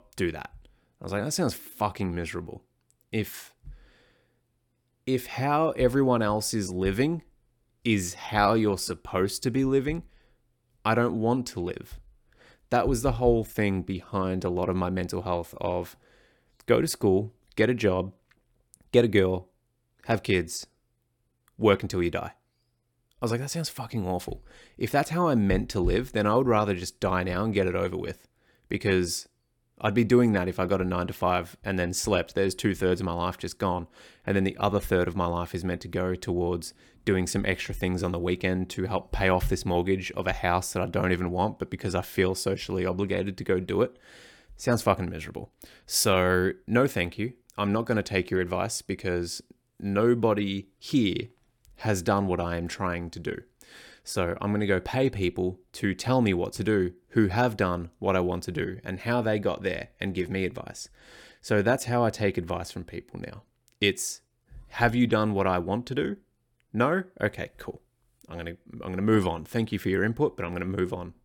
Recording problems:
none

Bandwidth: 18 kHz